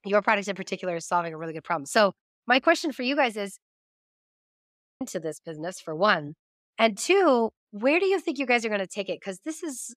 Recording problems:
audio freezing; at 4 s for 1 s

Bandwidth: 15 kHz